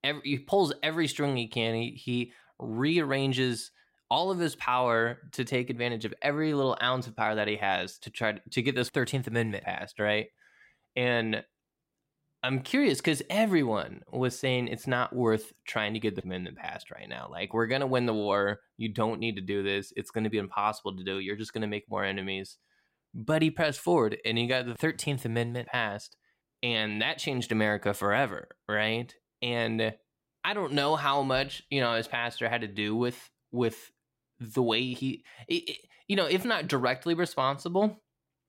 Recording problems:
none

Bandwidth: 16 kHz